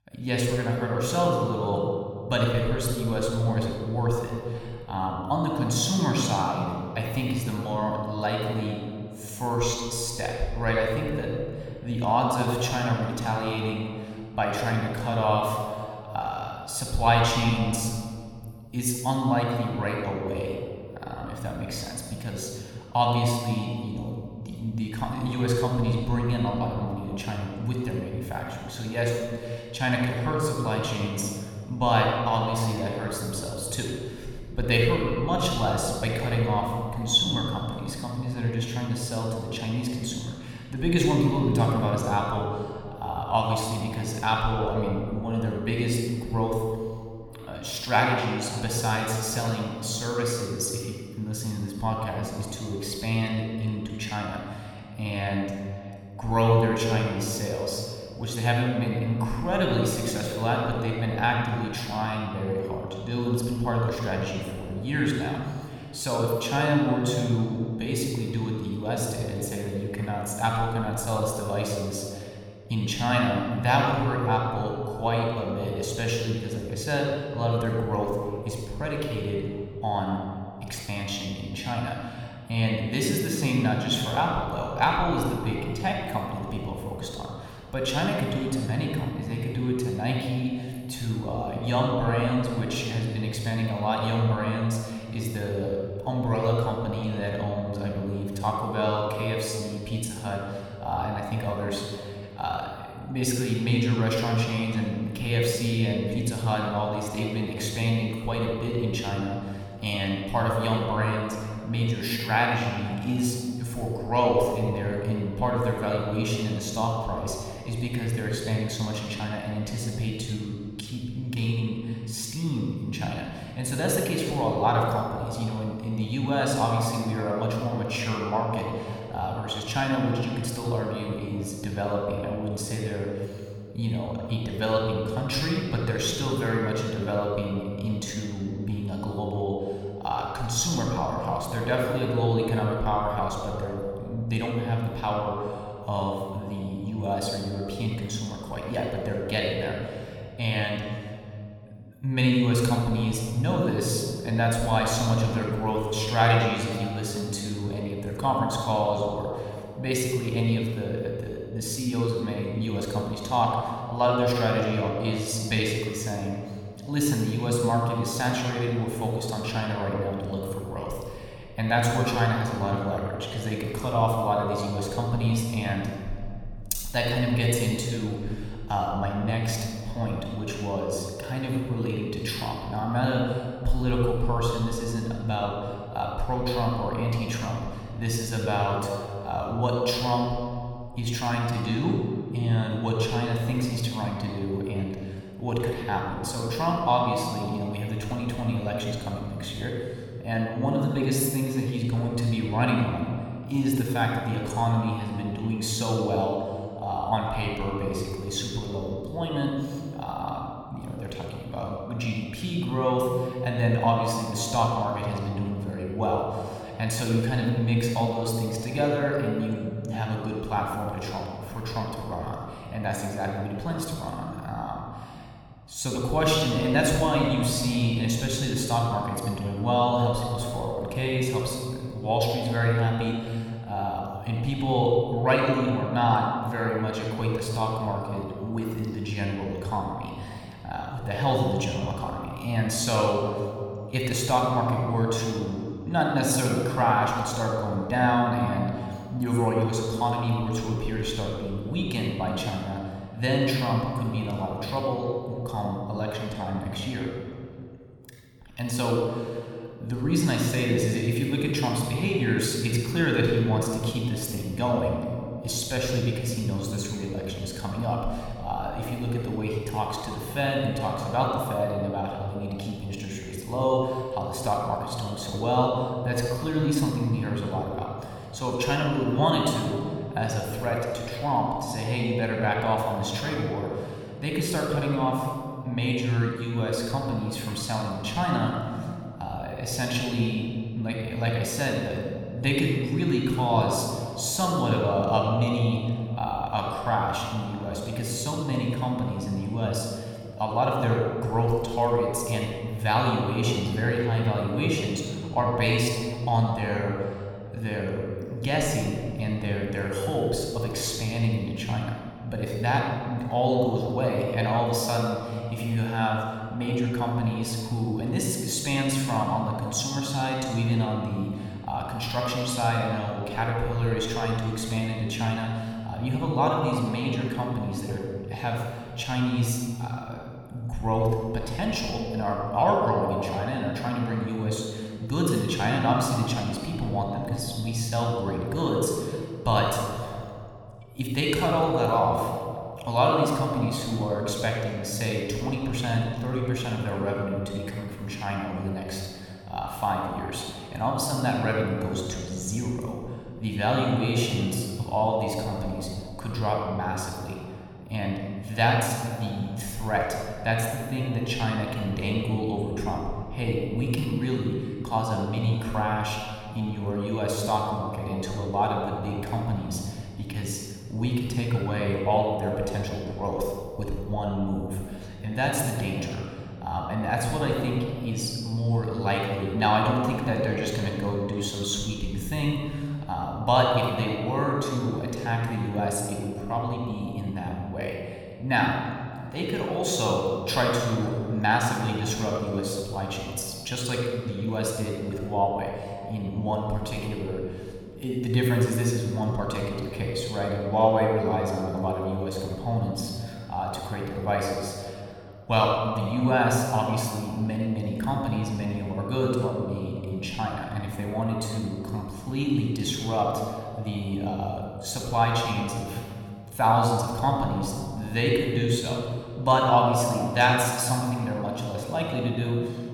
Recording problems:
room echo; noticeable; dies away in 2.1 s
off-mic speech; somewhat distant

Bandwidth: 18 kHz